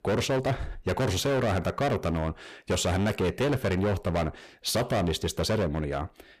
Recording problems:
distortion; heavy; 20% of the sound clipped

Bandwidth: 14.5 kHz